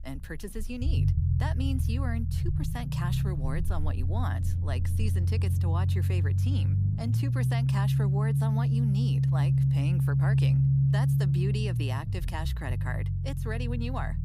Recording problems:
low rumble; very loud; throughout; as loud as the speech

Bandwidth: 15.5 kHz